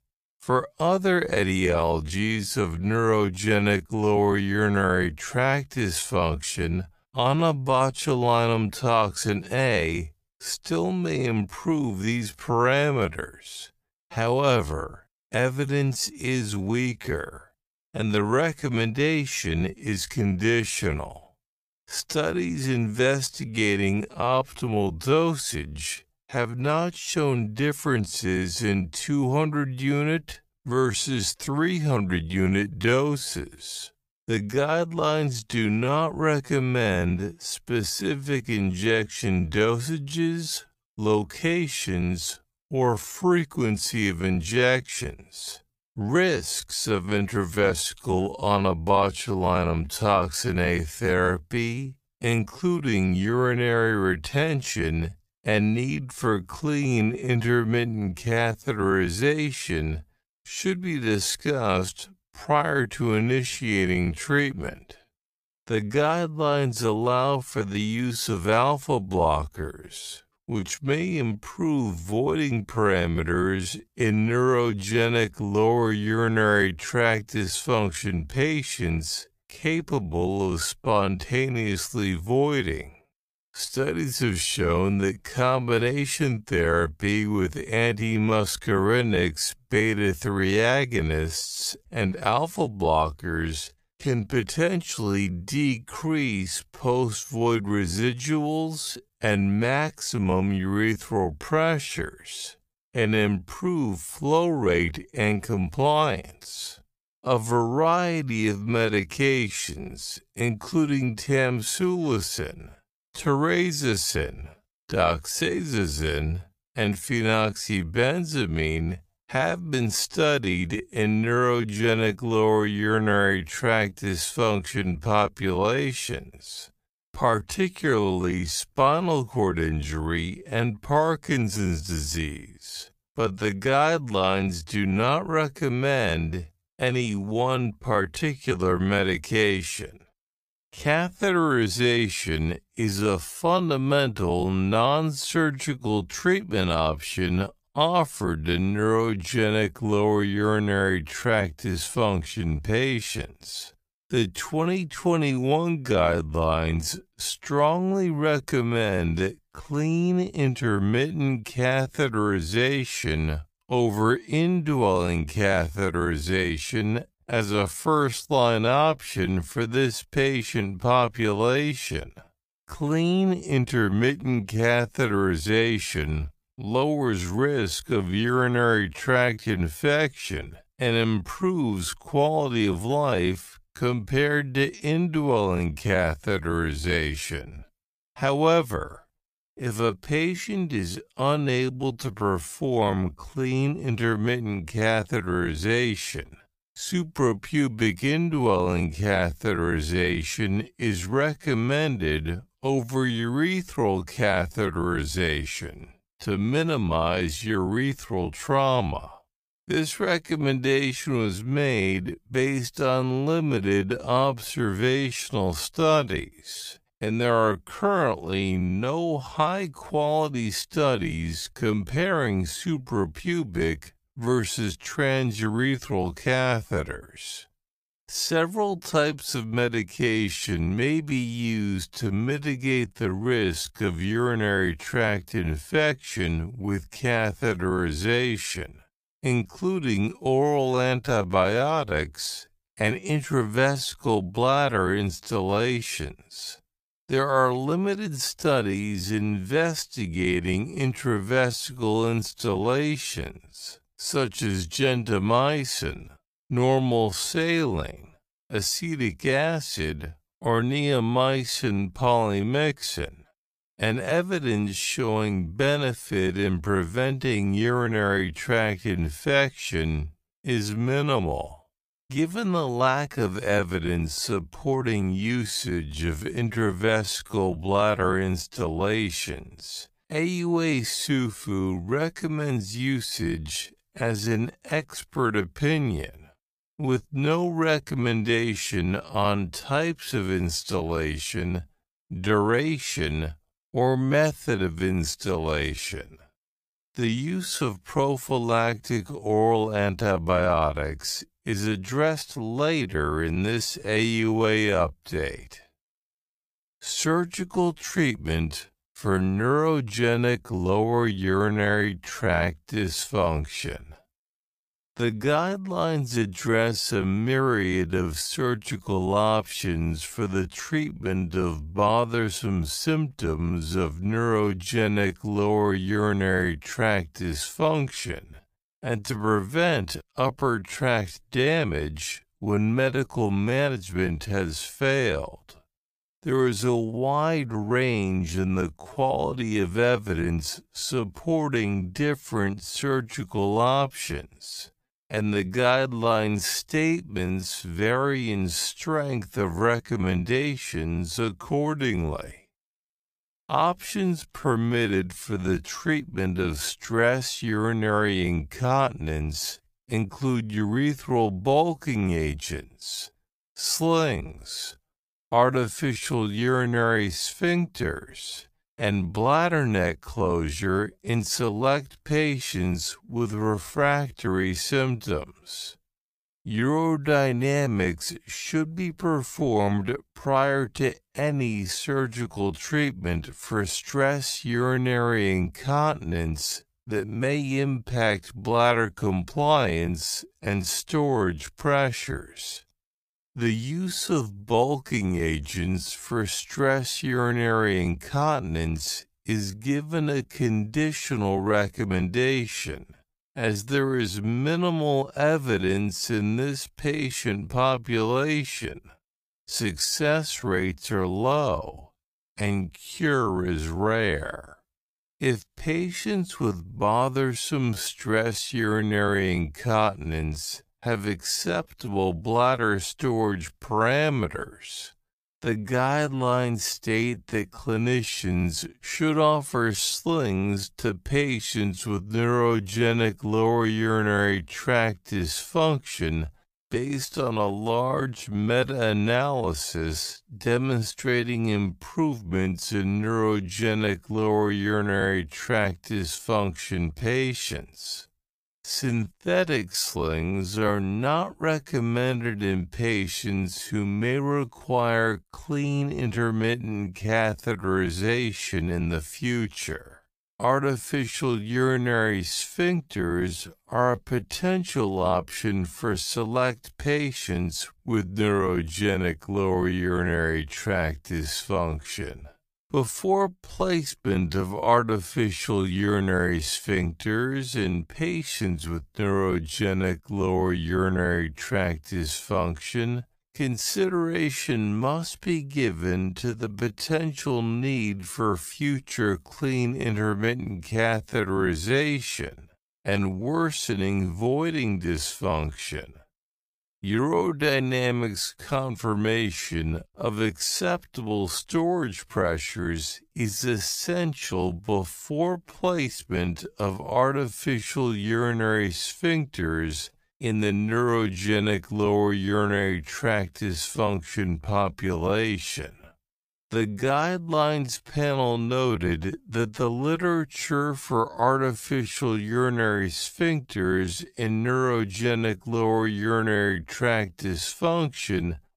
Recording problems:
wrong speed, natural pitch; too slow; 0.5 times normal speed

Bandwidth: 15 kHz